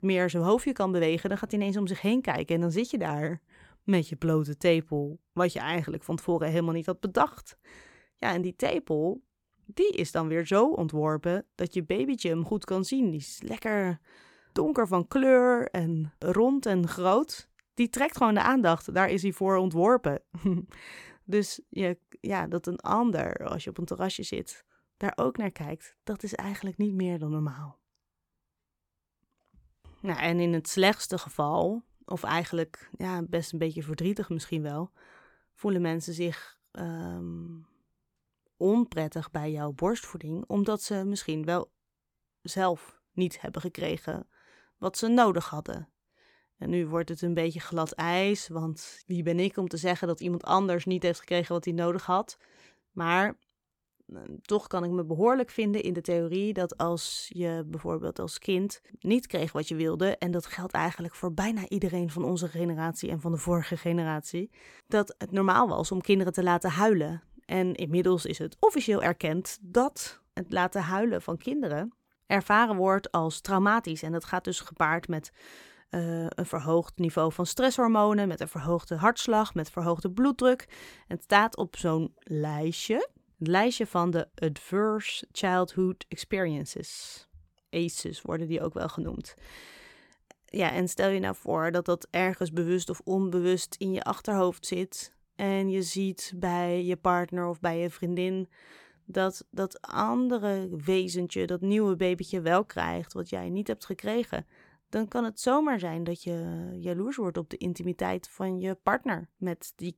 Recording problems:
none

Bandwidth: 17.5 kHz